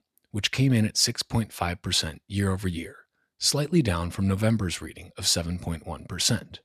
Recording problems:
none

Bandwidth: 14 kHz